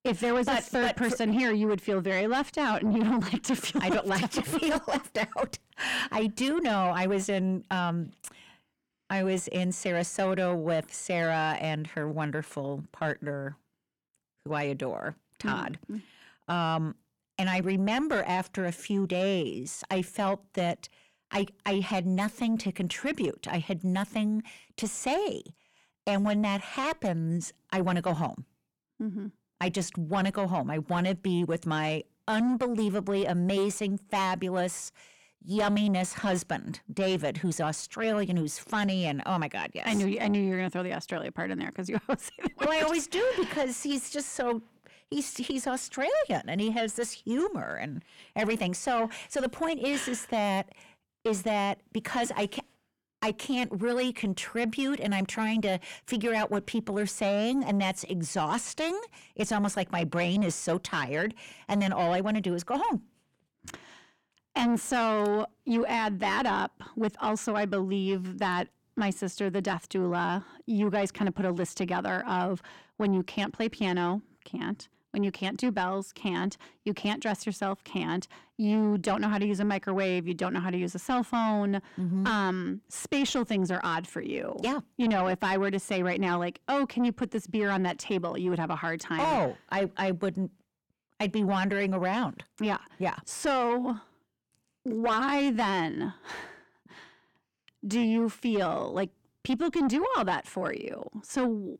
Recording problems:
distortion; slight; 10 dB below the speech

